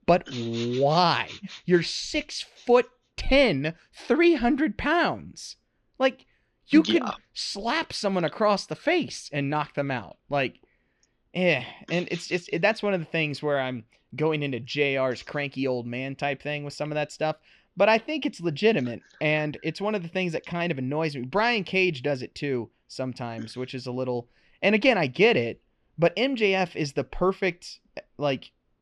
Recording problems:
muffled; very slightly; fading above 3 kHz

